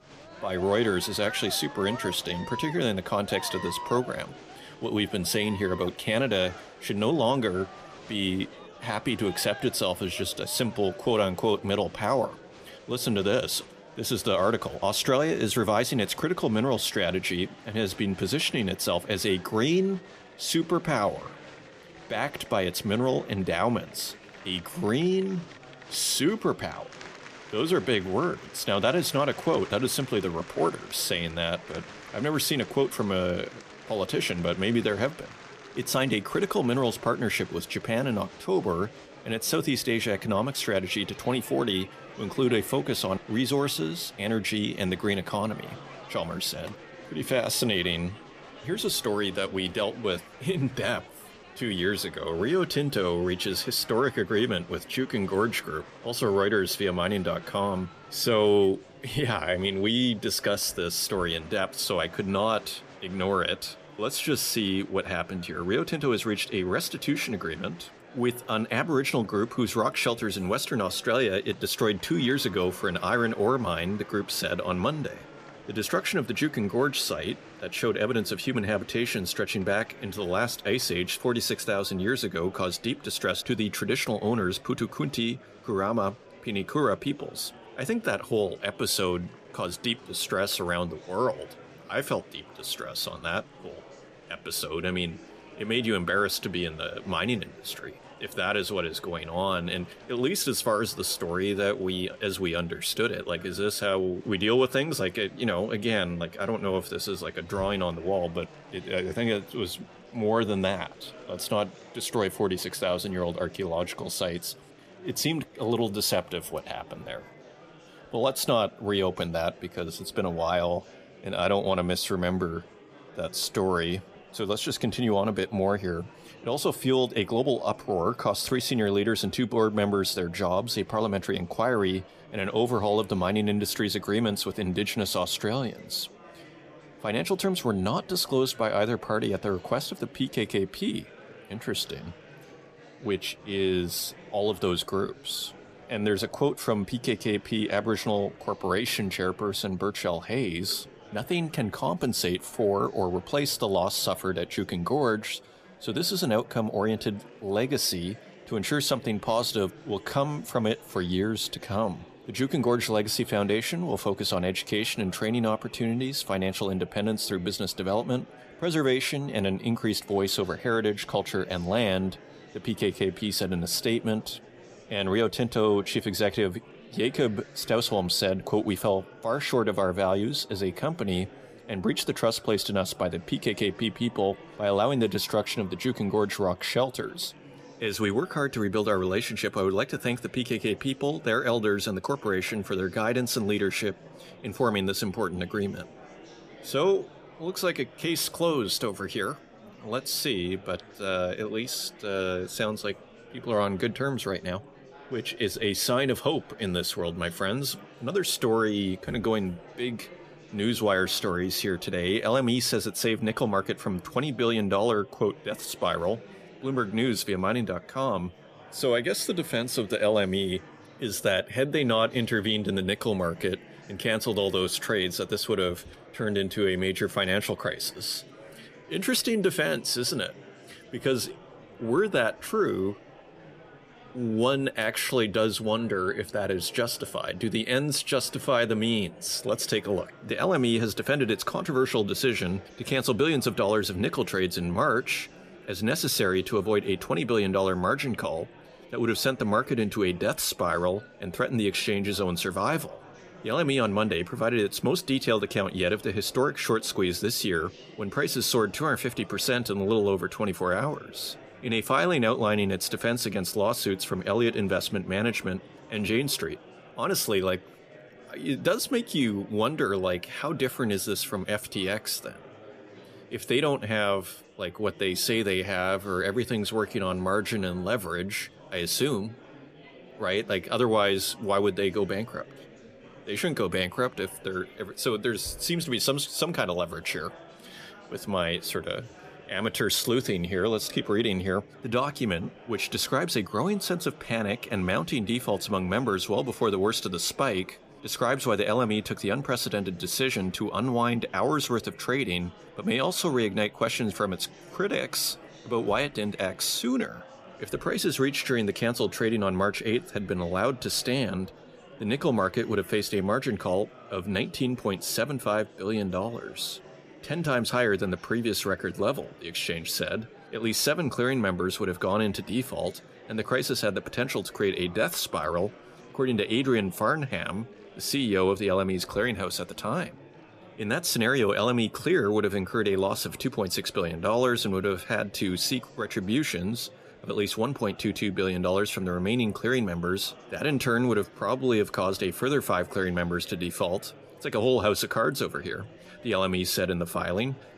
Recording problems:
murmuring crowd; faint; throughout; 20 dB below the speech

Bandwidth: 14.5 kHz